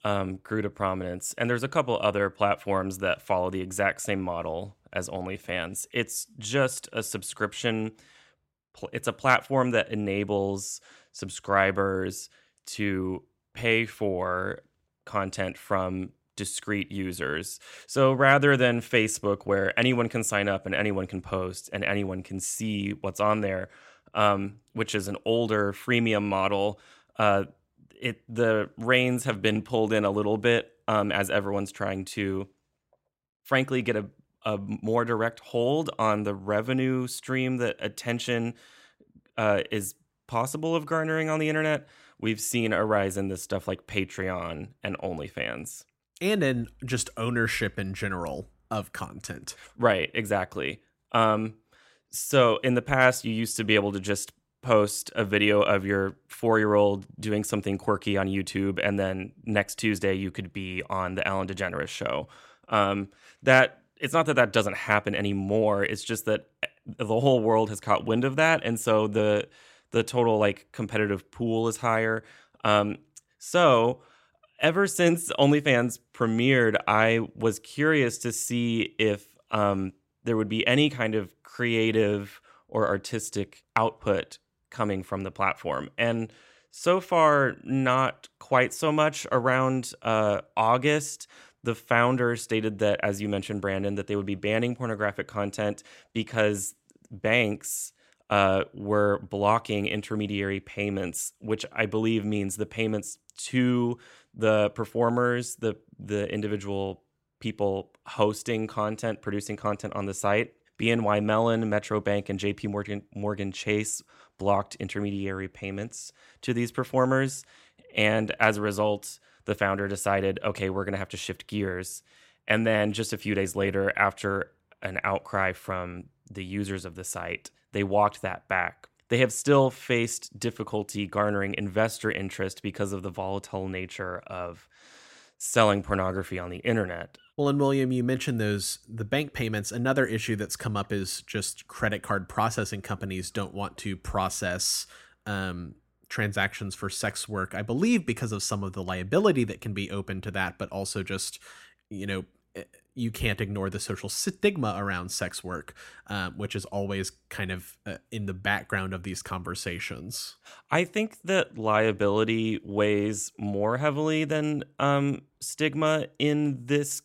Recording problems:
none

